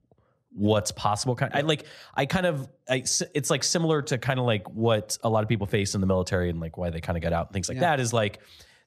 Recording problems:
none

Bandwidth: 14 kHz